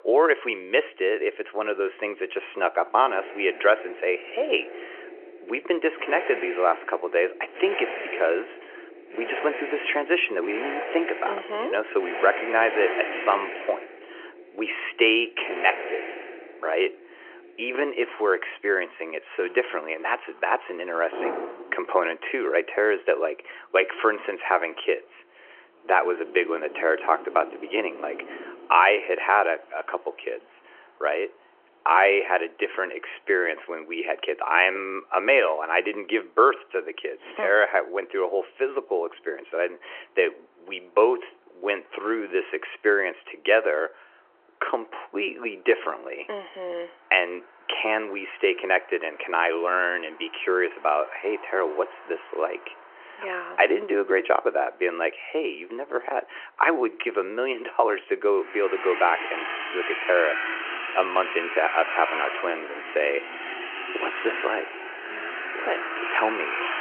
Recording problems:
phone-call audio; nothing above 2.5 kHz
traffic noise; loud; throughout; 8 dB below the speech

